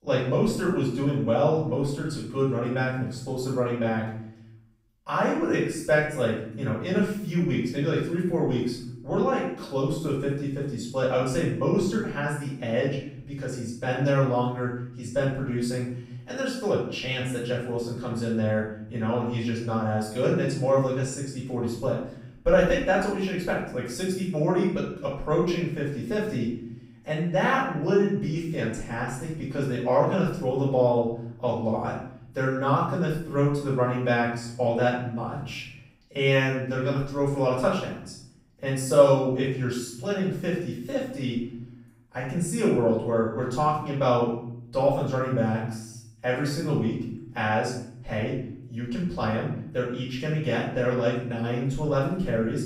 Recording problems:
off-mic speech; far
room echo; noticeable; dies away in 0.6 s

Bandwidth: 15.5 kHz